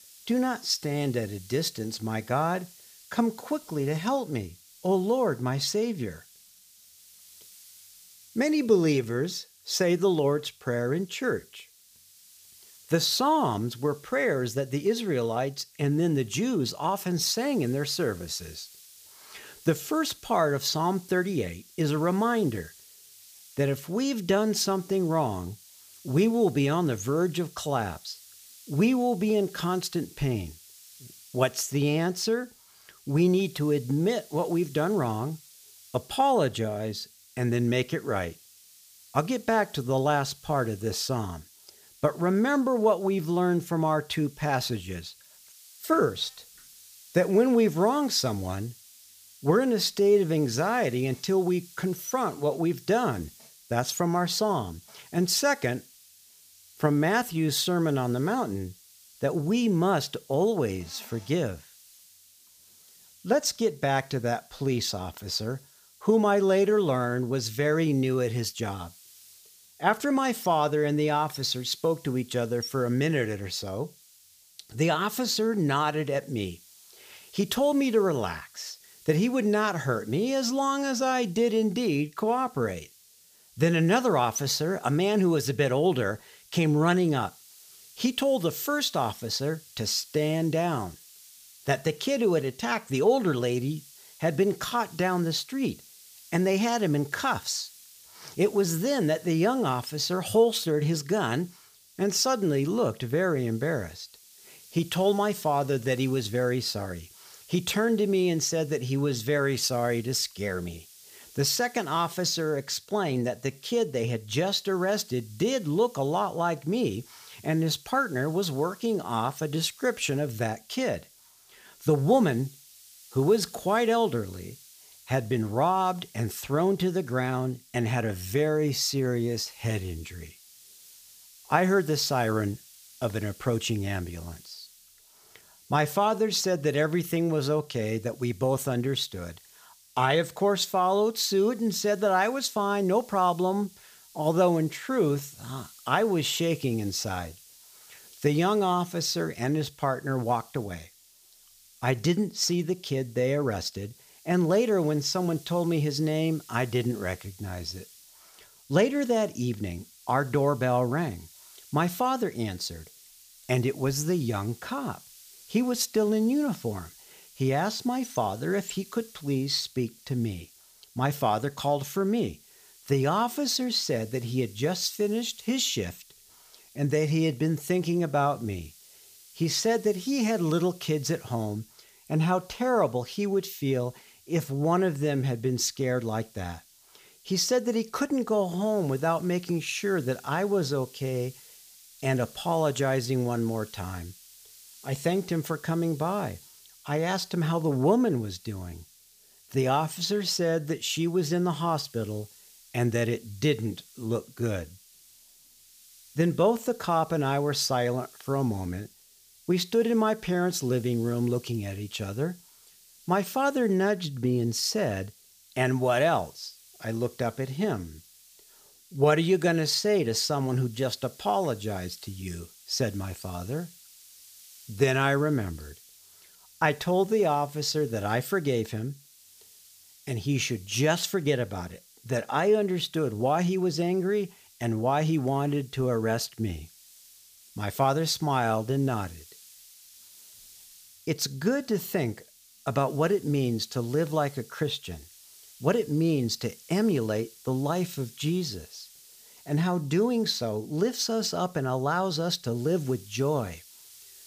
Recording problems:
hiss; faint; throughout; 25 dB below the speech

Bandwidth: 15 kHz